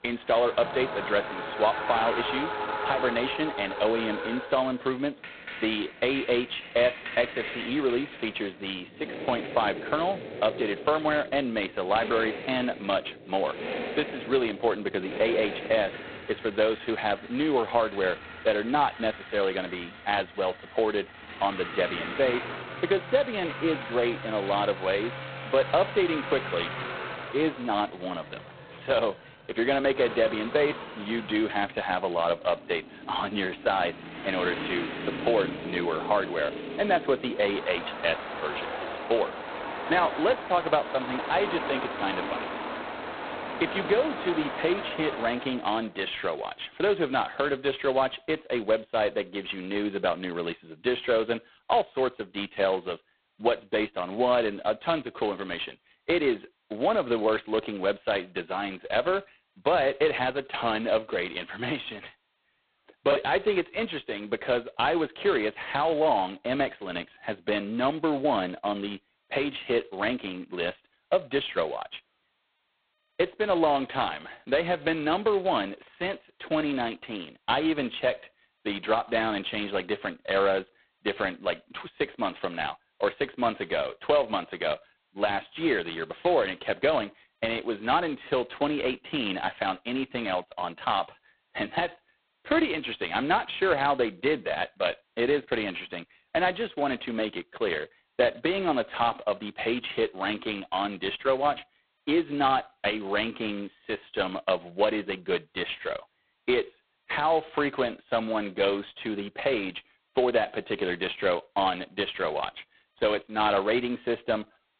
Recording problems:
phone-call audio; poor line; nothing above 4 kHz
traffic noise; loud; until 45 s; 9 dB below the speech
choppy; occasionally; at 1:03; 1% of the speech affected

